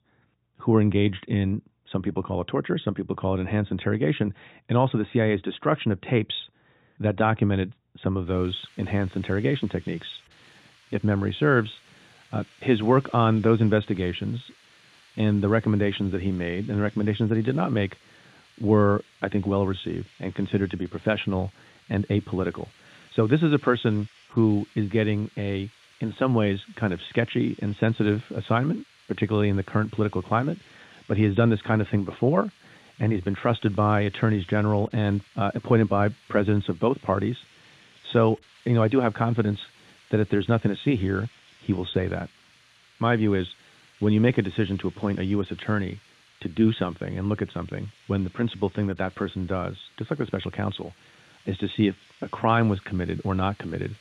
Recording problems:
high frequencies cut off; severe; nothing above 4 kHz
hiss; faint; from 8.5 s on; 30 dB below the speech

